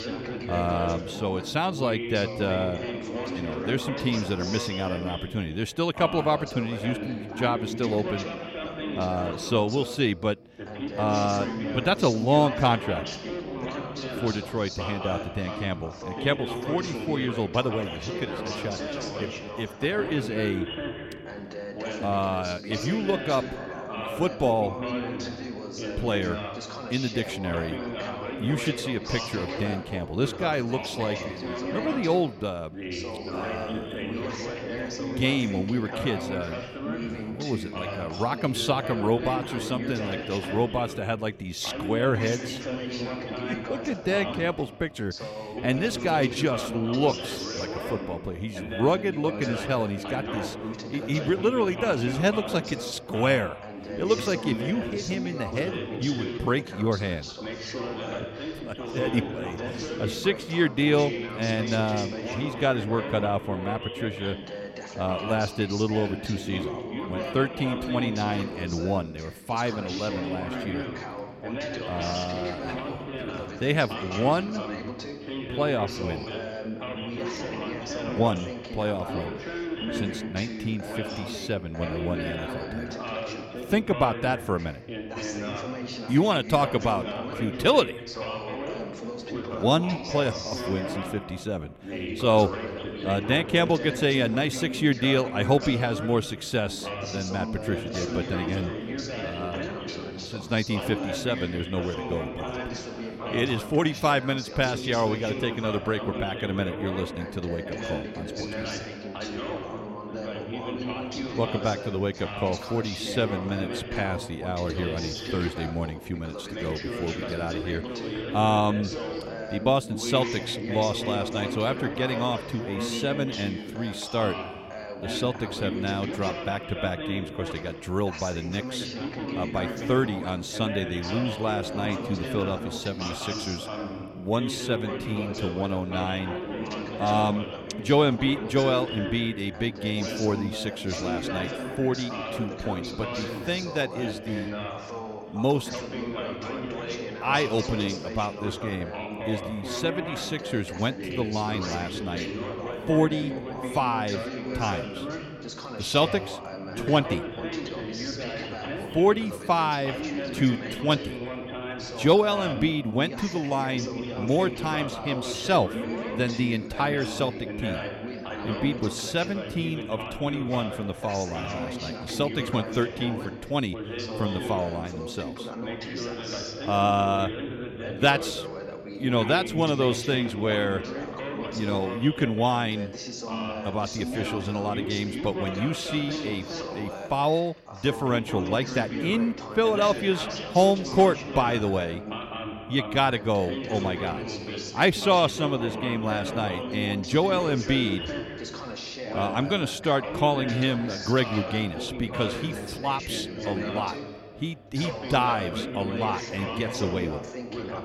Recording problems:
background chatter; loud; throughout; 2 voices, 6 dB below the speech

